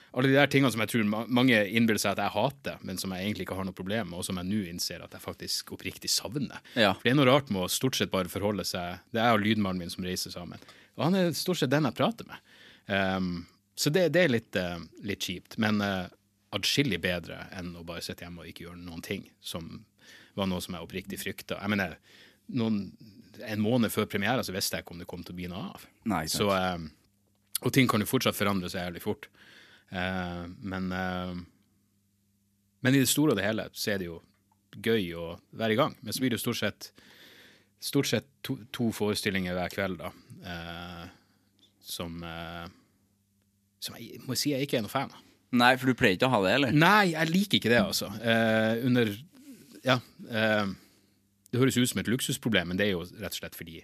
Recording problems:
none

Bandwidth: 14.5 kHz